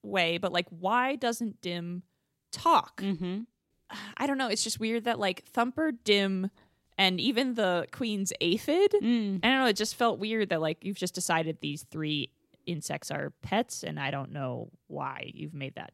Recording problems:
none

